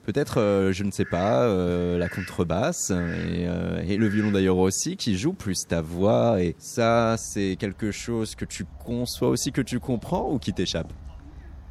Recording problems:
animal sounds; noticeable; throughout; 20 dB below the speech

